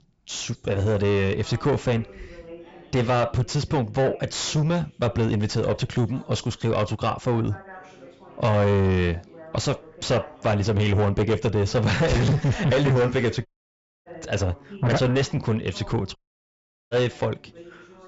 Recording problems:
distortion; heavy; 5 dB below the speech
high frequencies cut off; noticeable; nothing above 7.5 kHz
background chatter; faint; throughout; 2 voices, 20 dB below the speech
audio cutting out; at 13 s for 0.5 s and at 16 s for 1 s

